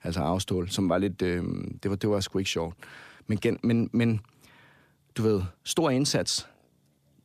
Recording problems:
none

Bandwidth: 14.5 kHz